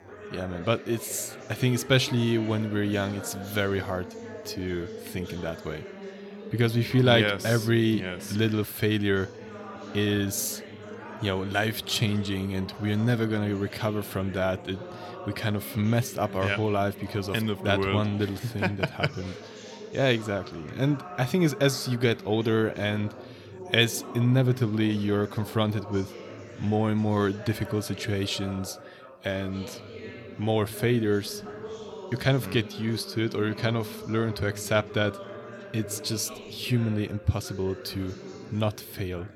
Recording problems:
background chatter; noticeable; throughout; 4 voices, 15 dB below the speech

